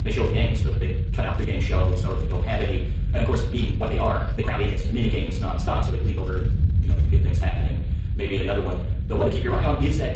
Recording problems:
off-mic speech; far
wrong speed, natural pitch; too fast; 1.6 times normal speed
room echo; slight; dies away in 0.6 s
garbled, watery; slightly; nothing above 8 kHz
low rumble; noticeable; throughout; 10 dB below the speech
uneven, jittery; strongly; from 0.5 to 9.5 s

